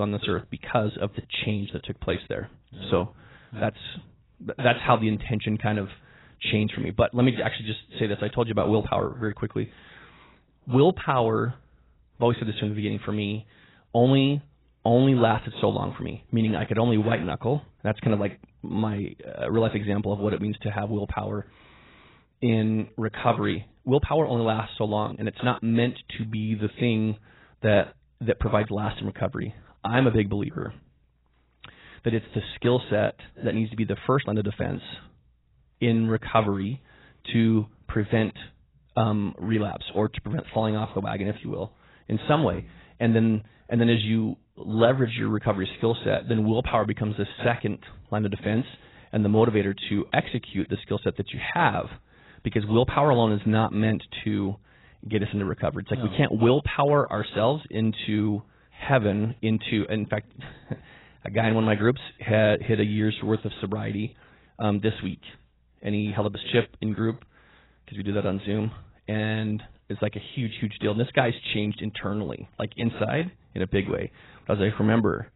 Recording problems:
garbled, watery; badly; nothing above 4 kHz
abrupt cut into speech; at the start

